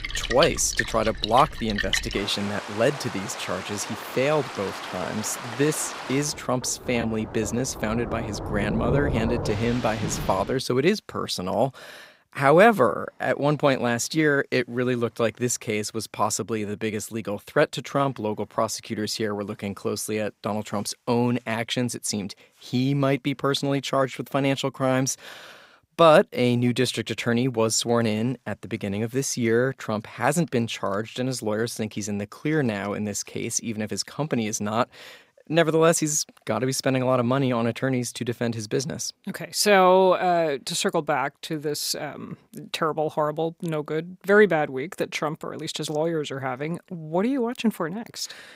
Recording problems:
rain or running water; loud; until 10 s; 7 dB below the speech

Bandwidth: 15.5 kHz